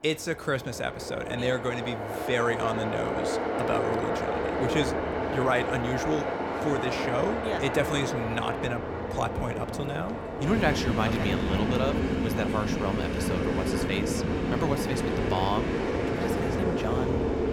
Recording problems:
train or aircraft noise; very loud; throughout; 2 dB above the speech

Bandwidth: 17.5 kHz